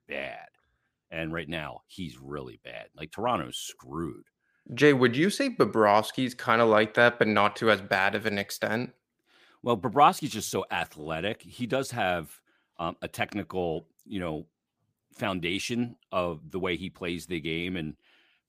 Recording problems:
none

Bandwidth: 15 kHz